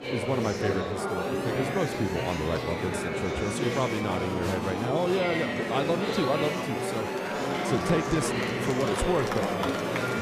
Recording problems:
murmuring crowd; very loud; throughout; 1 dB above the speech
siren; noticeable; from 1 s on; peak 8 dB below the speech

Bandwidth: 14.5 kHz